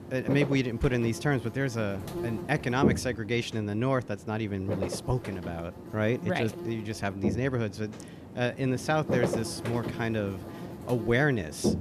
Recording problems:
electrical hum; loud; throughout; 60 Hz, 7 dB below the speech

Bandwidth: 14.5 kHz